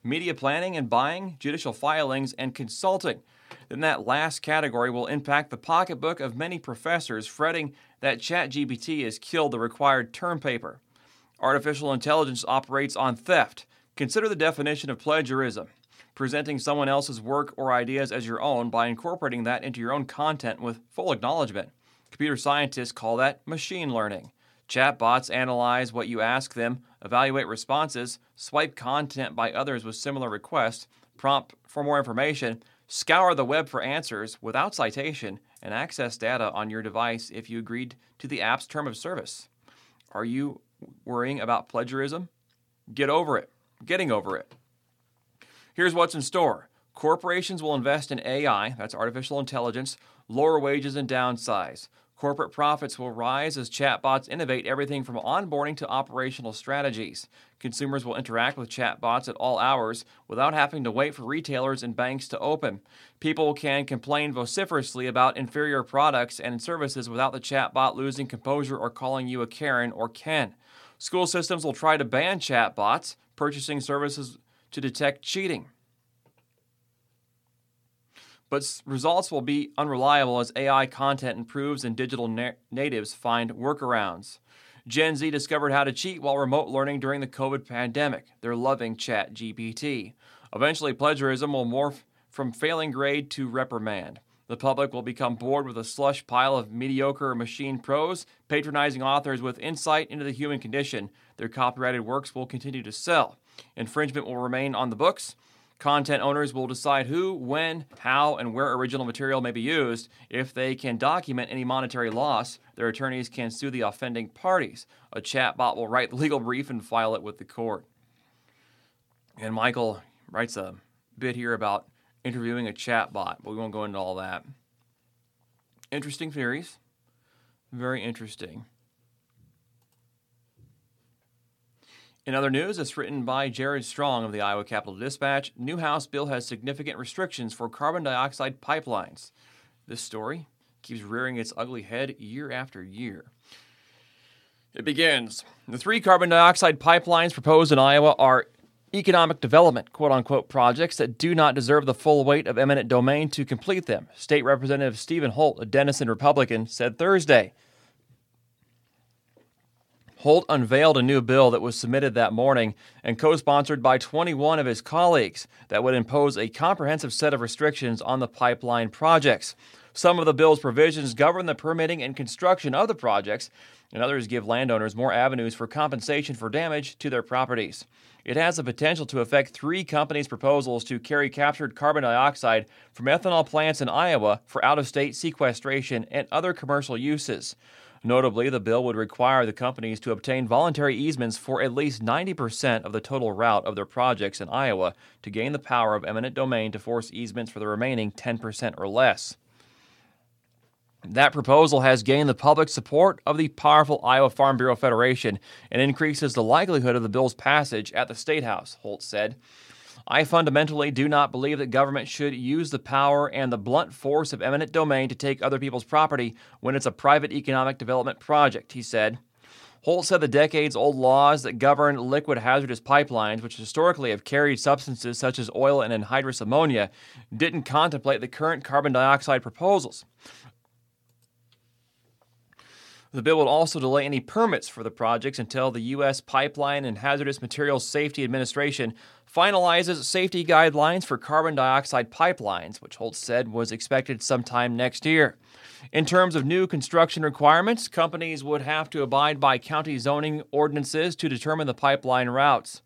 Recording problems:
none

